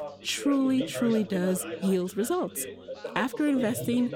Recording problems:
background chatter; loud; throughout; 3 voices, 10 dB below the speech

